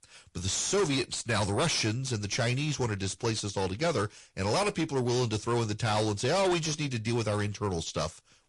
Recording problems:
distortion; heavy; 7 dB below the speech
garbled, watery; slightly

